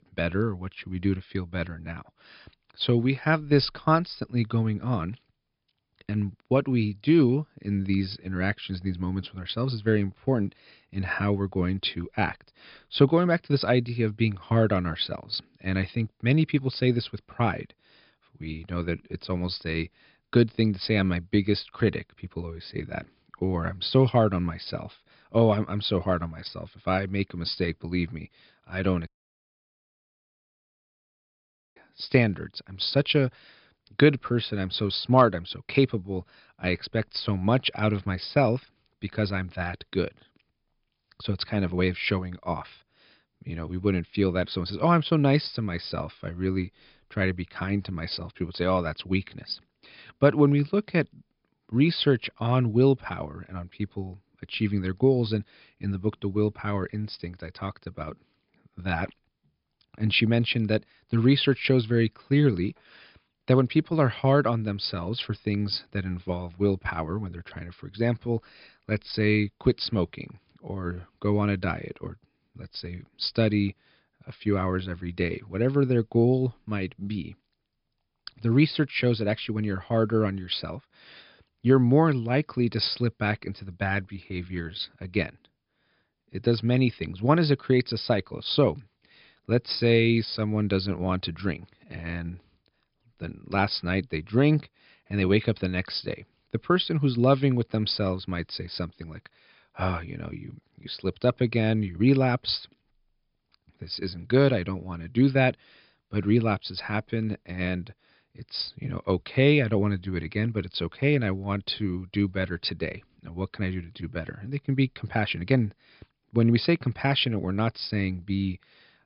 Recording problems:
high frequencies cut off; noticeable; nothing above 5.5 kHz
audio cutting out; at 29 s for 2.5 s

